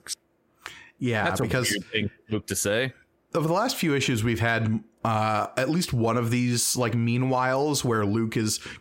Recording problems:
squashed, flat; heavily

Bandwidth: 16 kHz